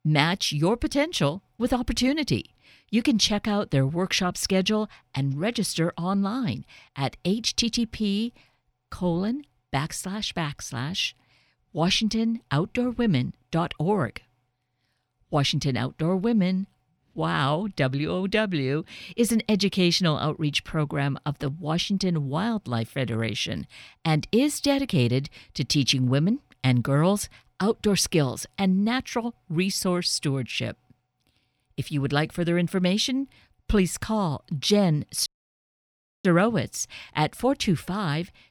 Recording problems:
audio cutting out; at 35 s for 1 s

